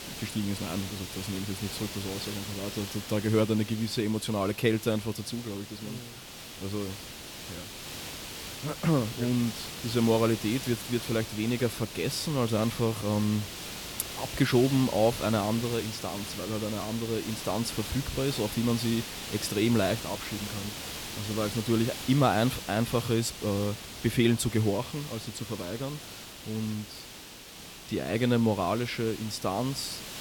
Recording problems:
hiss; loud; throughout; 9 dB below the speech

